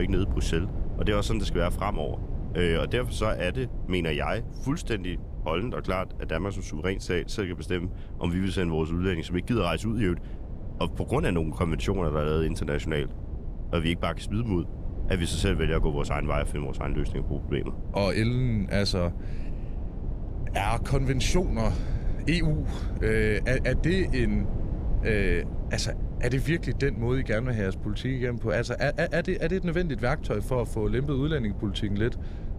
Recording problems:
low rumble; noticeable; throughout; 15 dB below the speech
abrupt cut into speech; at the start

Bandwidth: 14.5 kHz